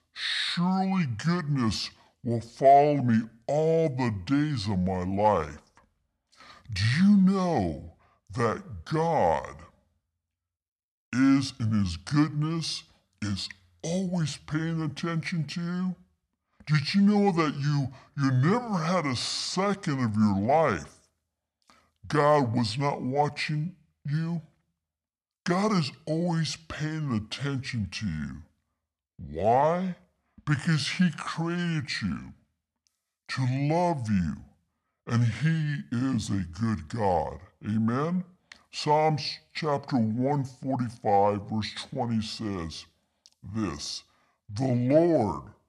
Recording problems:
wrong speed and pitch; too slow and too low; 0.7 times normal speed

